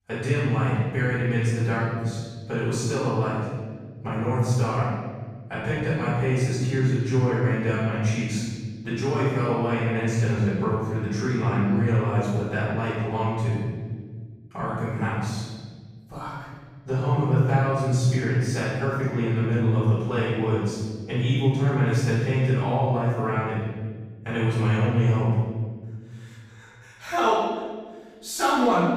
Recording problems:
room echo; strong; dies away in 1.7 s
off-mic speech; far

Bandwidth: 15.5 kHz